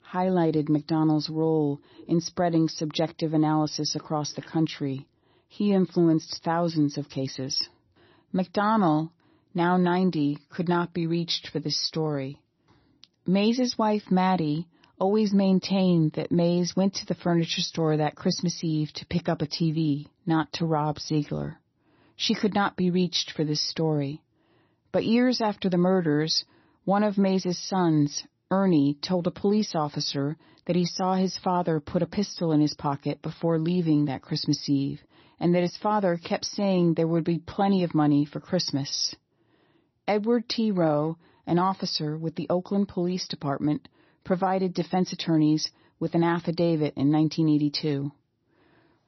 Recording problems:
garbled, watery; slightly; nothing above 6 kHz

